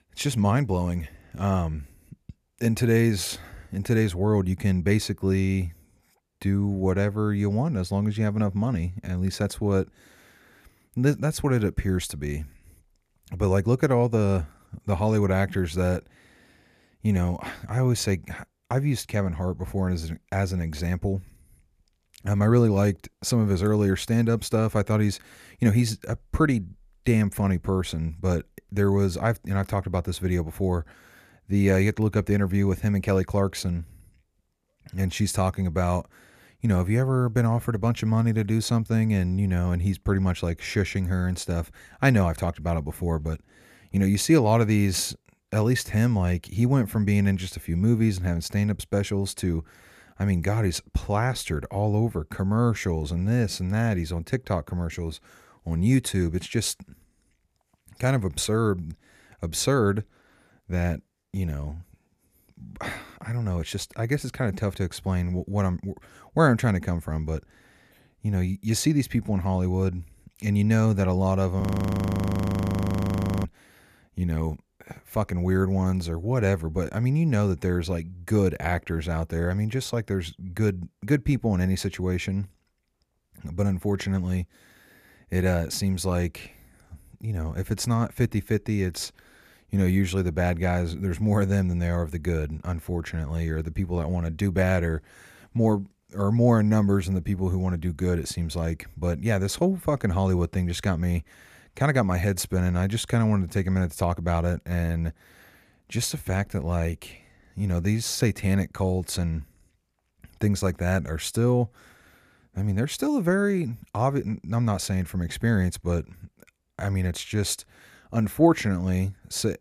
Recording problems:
audio freezing; at 1:12 for 2 s

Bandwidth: 14.5 kHz